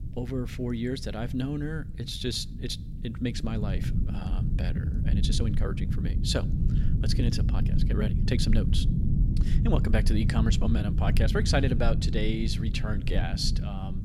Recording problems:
low rumble; loud; throughout; 7 dB below the speech
uneven, jittery; strongly; from 2 to 13 s

